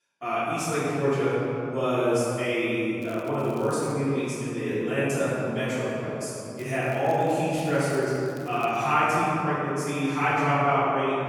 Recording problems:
room echo; strong; dies away in 2.8 s
off-mic speech; far
crackling; faint; at 3 s, at 6.5 s and from 7.5 to 9 s; 30 dB below the speech

